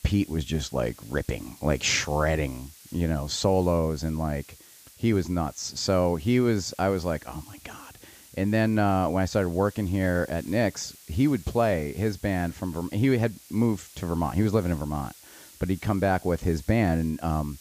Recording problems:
high frequencies cut off; noticeable; nothing above 8 kHz
hiss; faint; throughout; 20 dB below the speech

